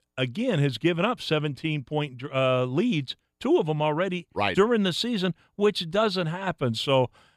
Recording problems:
none

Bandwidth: 15 kHz